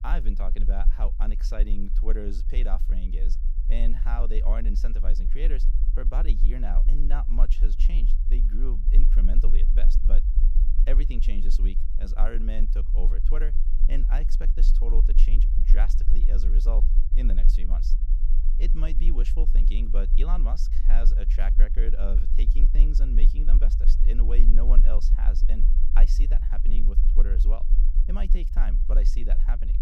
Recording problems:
low rumble; loud; throughout; 9 dB below the speech

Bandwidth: 15.5 kHz